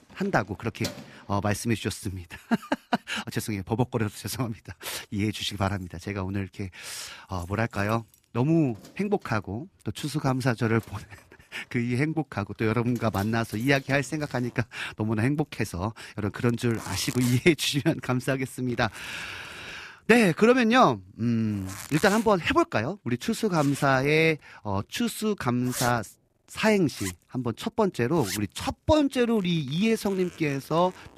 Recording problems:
household noises; noticeable; throughout; 15 dB below the speech

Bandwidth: 14.5 kHz